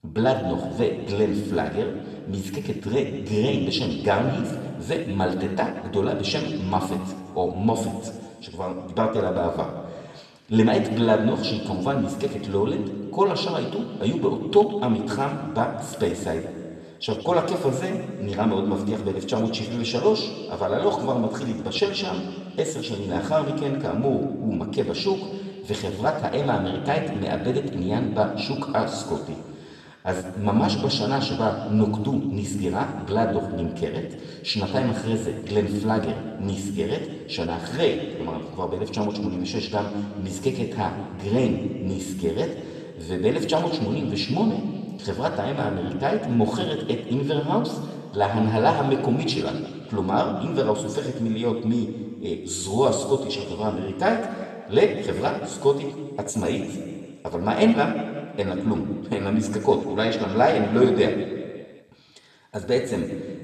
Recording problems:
room echo; noticeable; dies away in 1.5 s
off-mic speech; somewhat distant

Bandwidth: 13.5 kHz